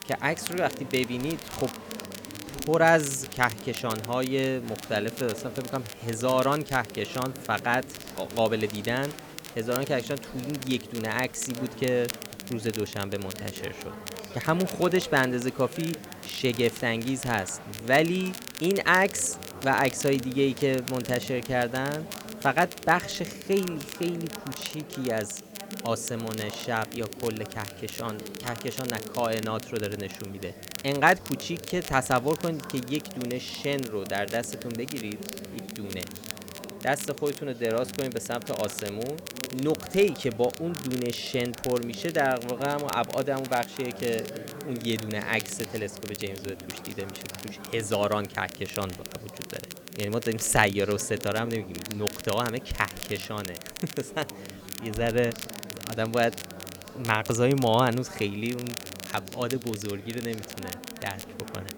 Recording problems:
murmuring crowd; noticeable; throughout; 15 dB below the speech
crackle, like an old record; noticeable; 10 dB below the speech
hiss; faint; throughout; 25 dB below the speech

